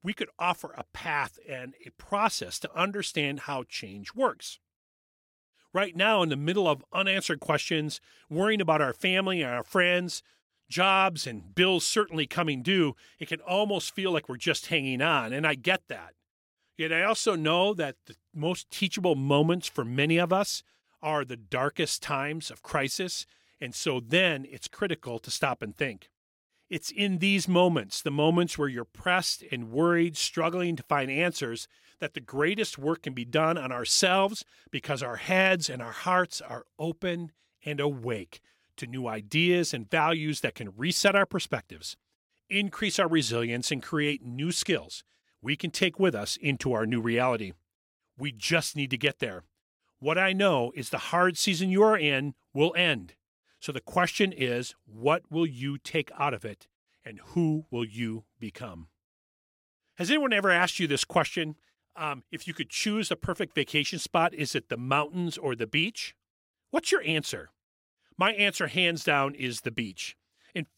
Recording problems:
none

